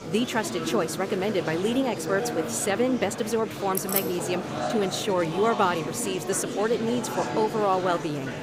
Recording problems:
murmuring crowd; loud; throughout; 6 dB below the speech
jangling keys; noticeable; at 4 s; peak 1 dB below the speech

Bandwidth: 15.5 kHz